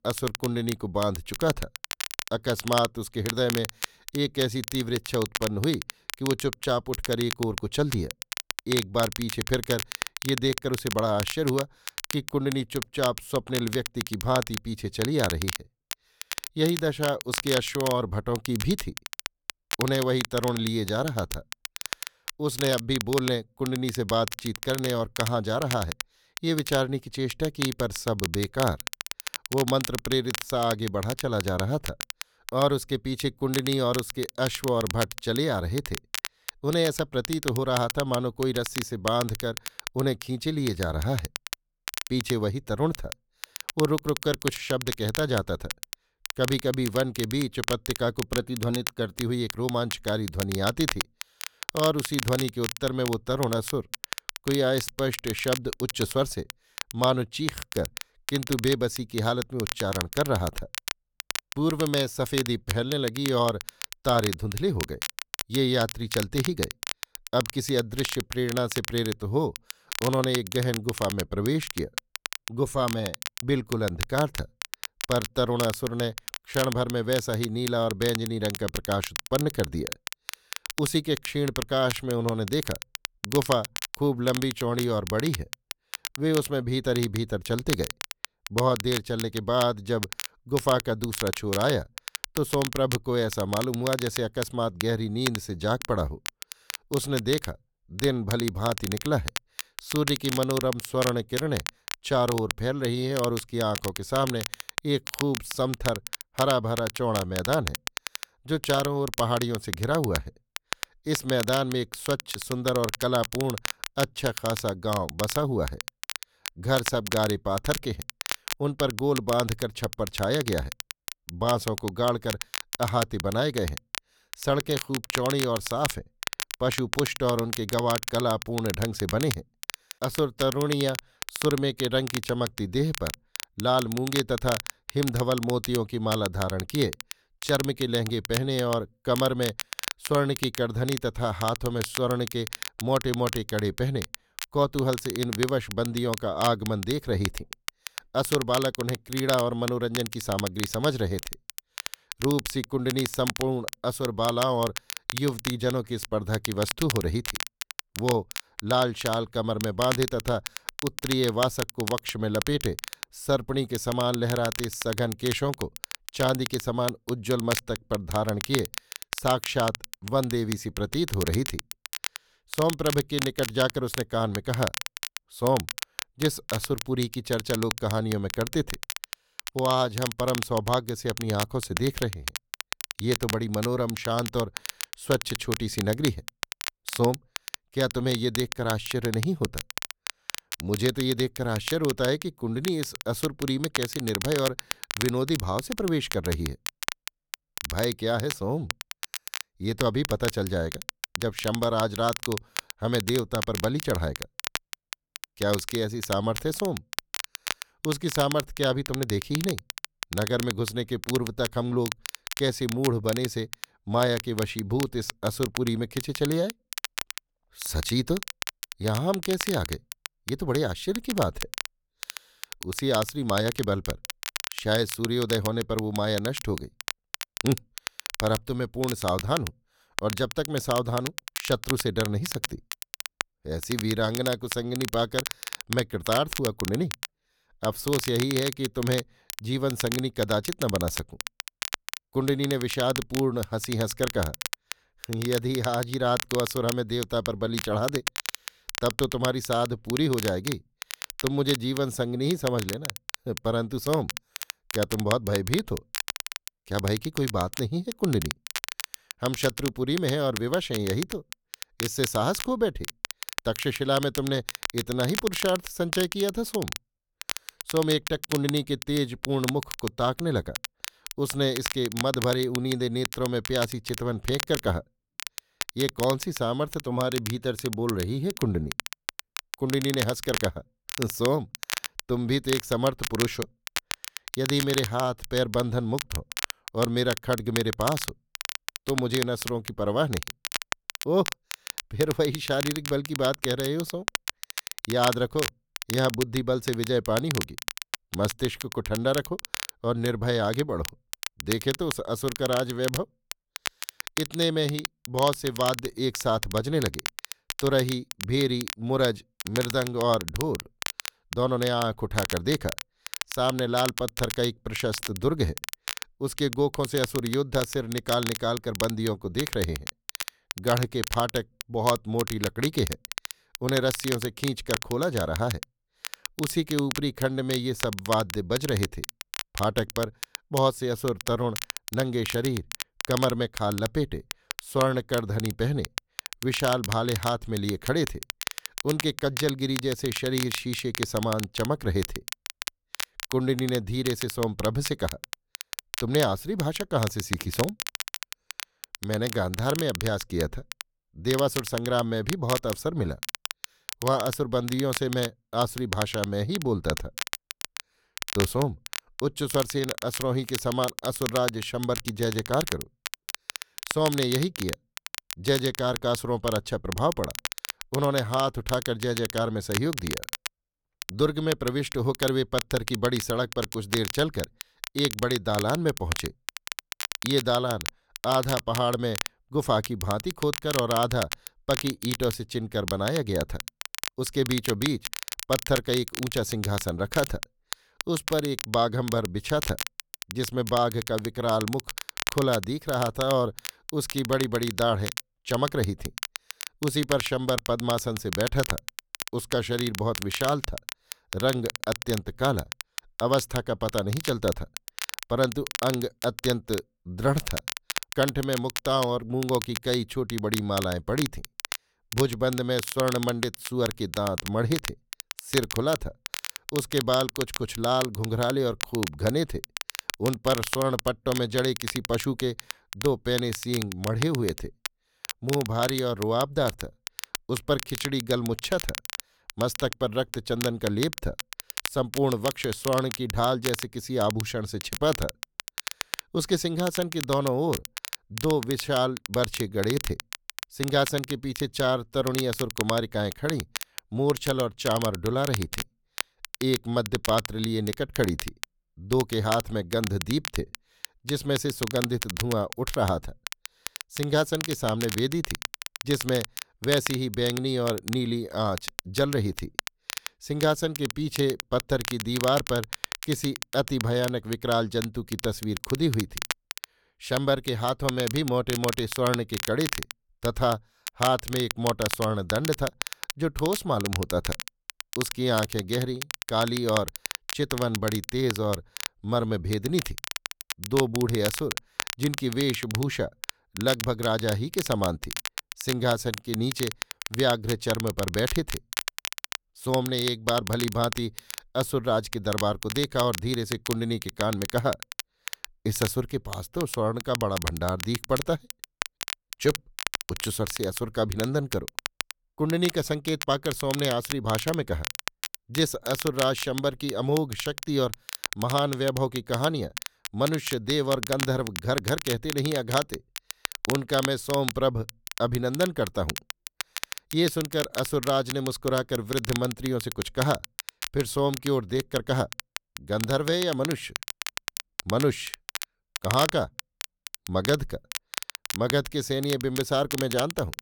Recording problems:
crackle, like an old record; loud; 7 dB below the speech

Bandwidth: 18.5 kHz